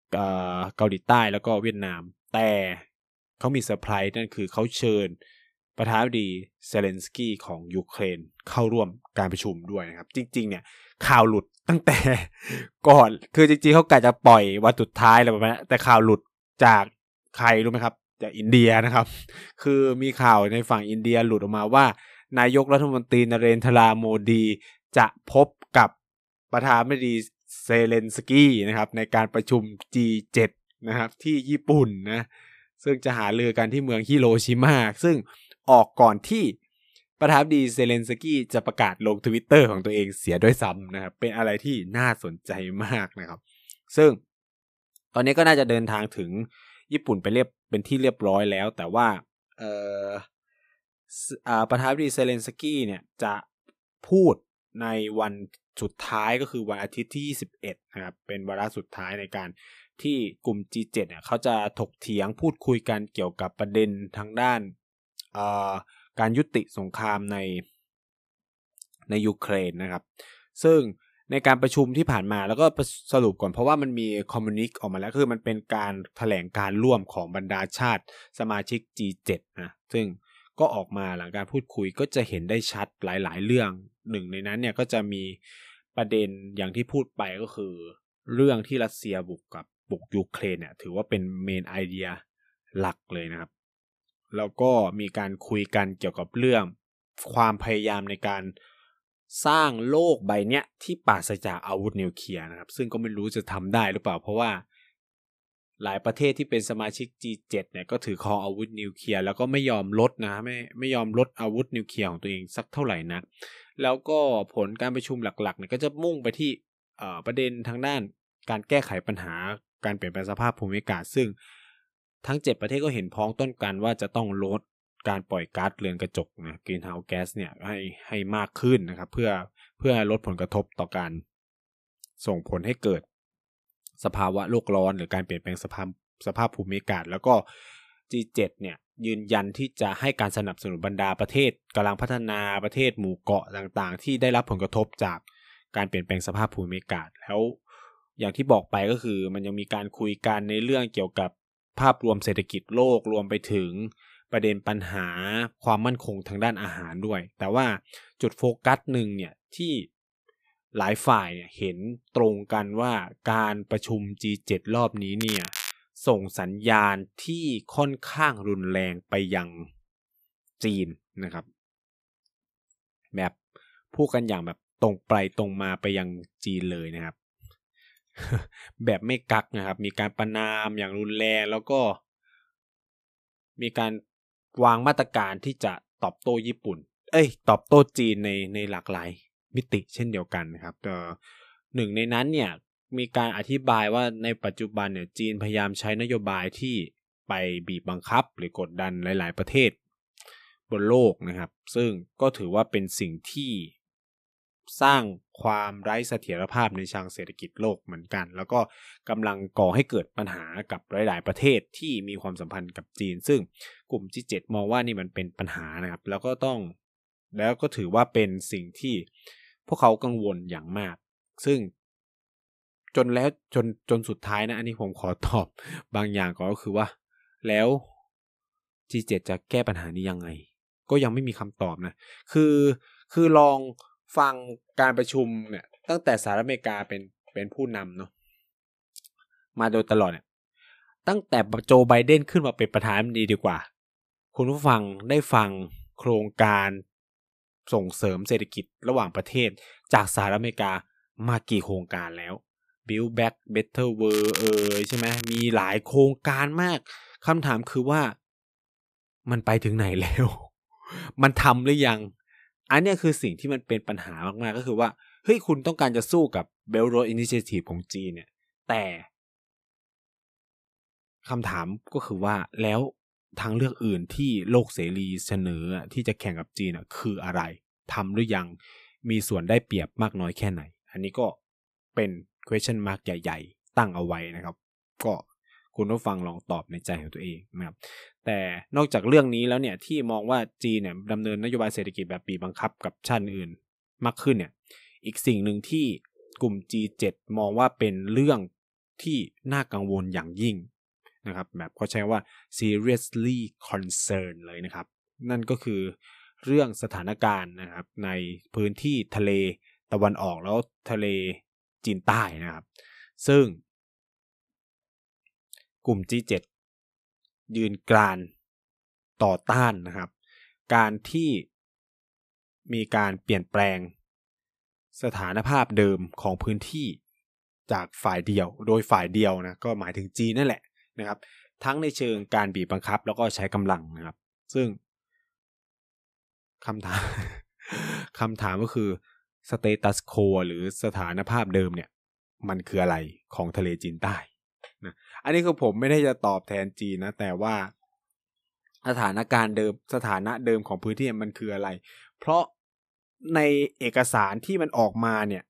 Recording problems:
crackling; loud; at 2:45 and from 4:14 to 4:15; 6 dB below the speech

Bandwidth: 14.5 kHz